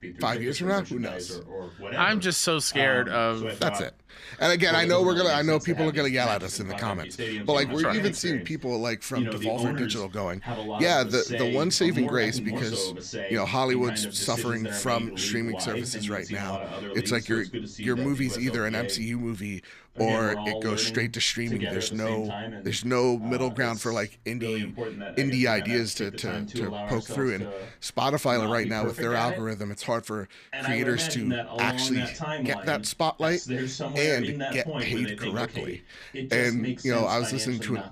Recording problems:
voice in the background; loud; throughout; 7 dB below the speech

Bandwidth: 14.5 kHz